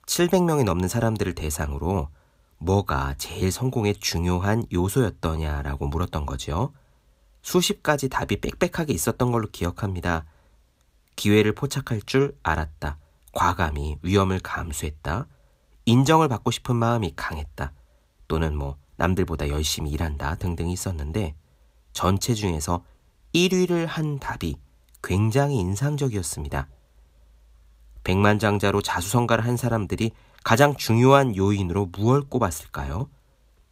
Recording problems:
none

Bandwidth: 15.5 kHz